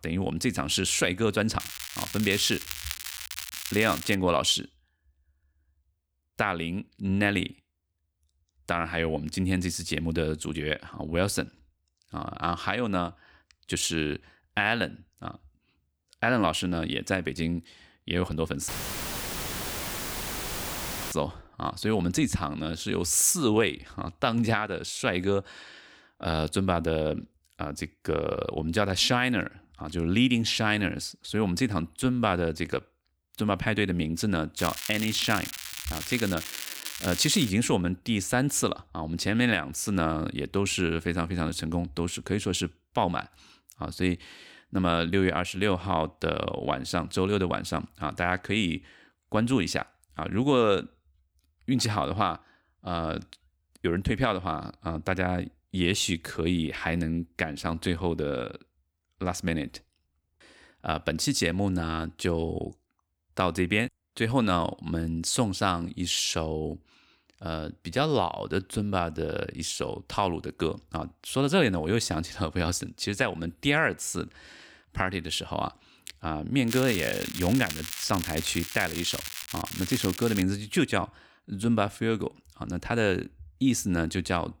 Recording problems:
crackling; loud; from 1.5 to 4 s, from 35 to 38 s and from 1:17 to 1:20; 7 dB below the speech
audio cutting out; filled with static; at 19 s for 2.5 s

